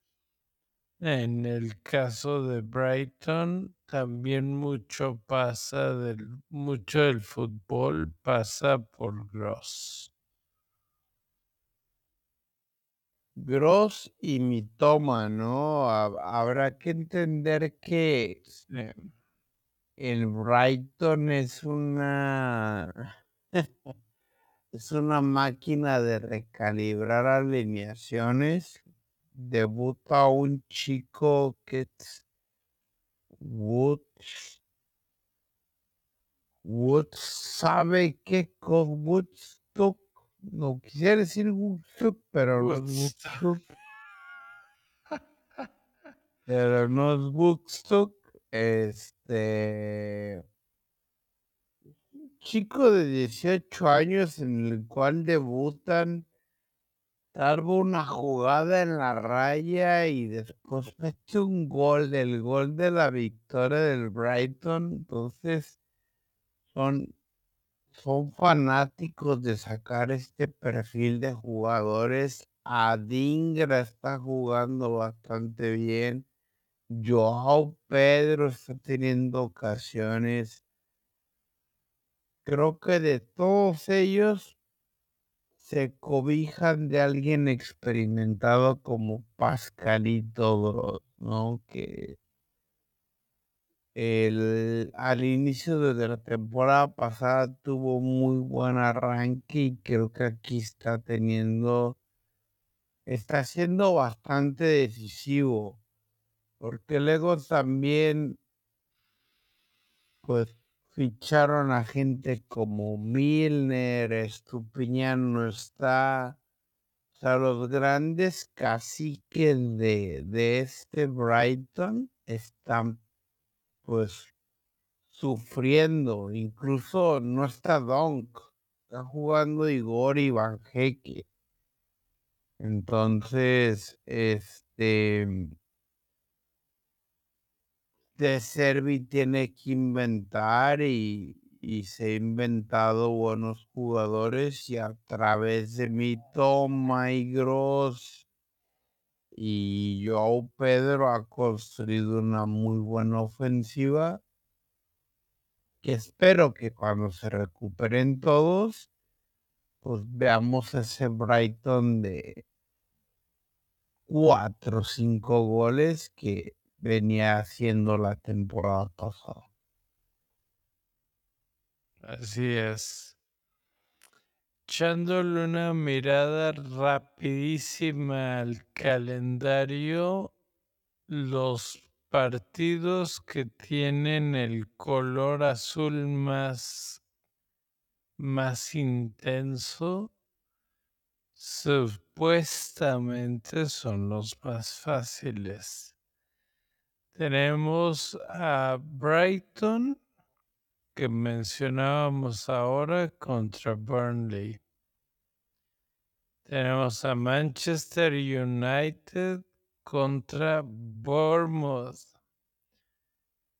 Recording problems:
wrong speed, natural pitch; too slow; 0.5 times normal speed

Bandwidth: 18 kHz